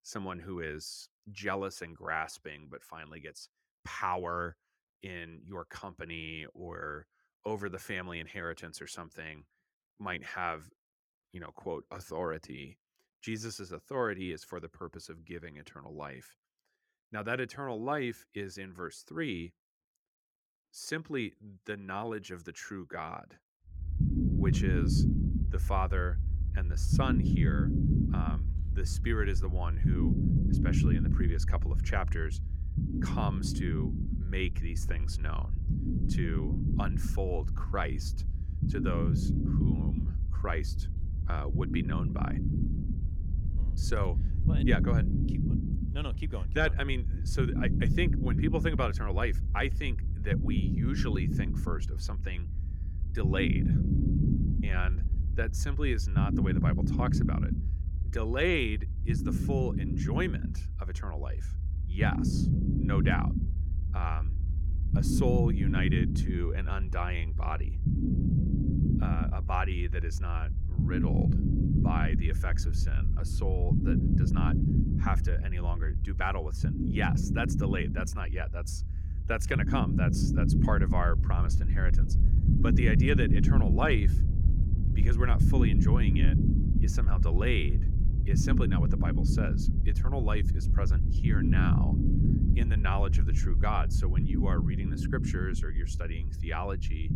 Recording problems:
low rumble; loud; from 24 s on; 3 dB below the speech

